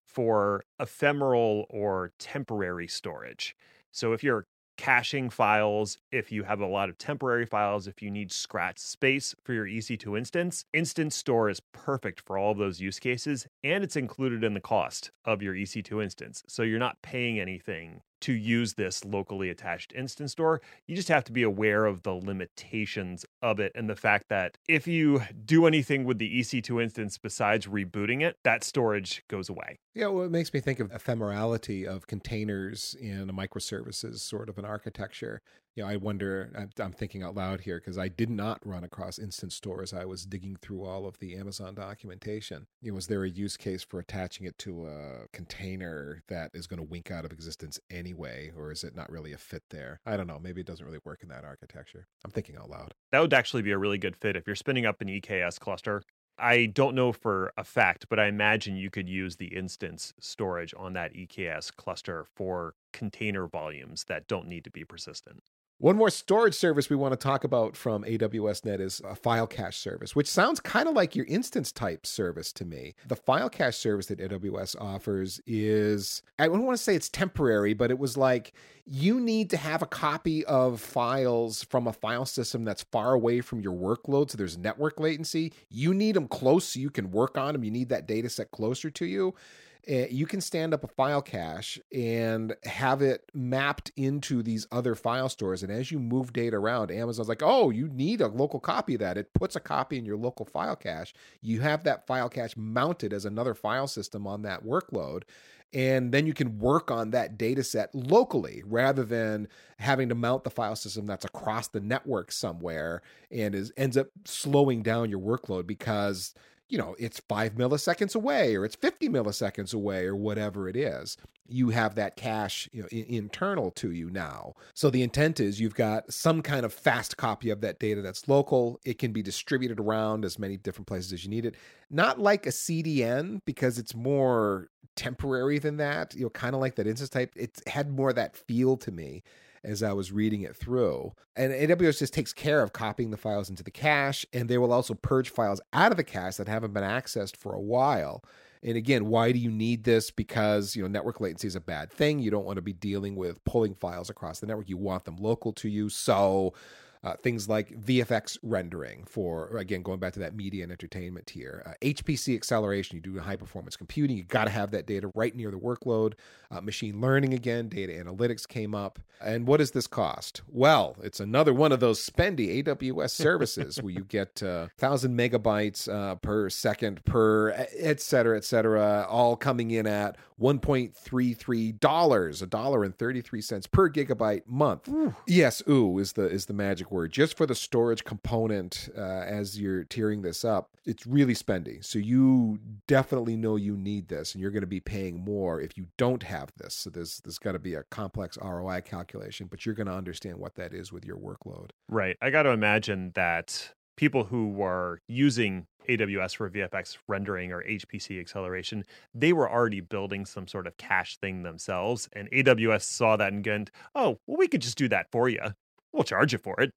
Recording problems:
none

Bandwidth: 16 kHz